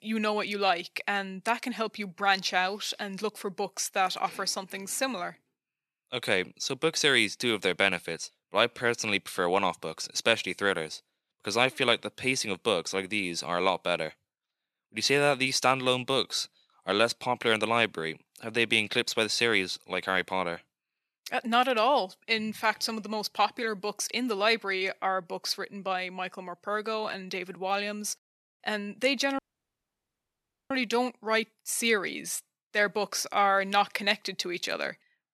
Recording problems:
thin; somewhat; fading below 300 Hz
audio cutting out; at 29 s for 1.5 s

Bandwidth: 13.5 kHz